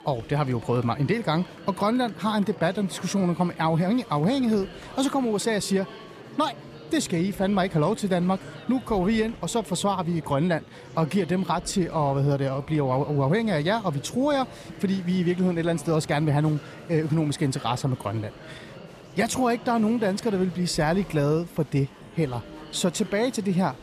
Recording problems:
murmuring crowd; noticeable; throughout; 15 dB below the speech

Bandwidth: 14.5 kHz